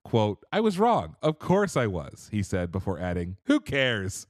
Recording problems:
none

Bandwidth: 13.5 kHz